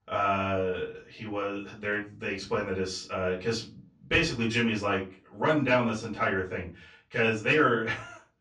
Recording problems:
off-mic speech; far
room echo; slight; dies away in 0.3 s

